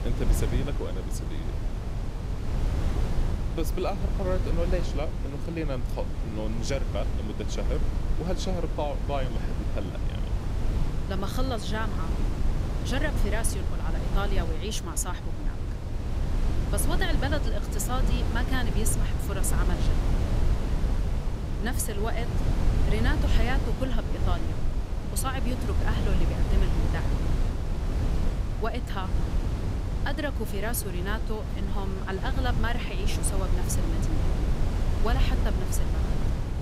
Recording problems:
wind noise on the microphone; heavy; 5 dB below the speech

